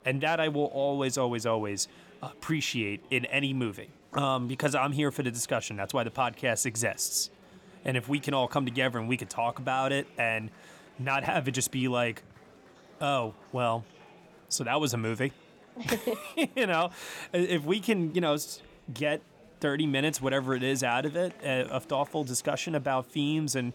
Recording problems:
murmuring crowd; faint; throughout; 25 dB below the speech

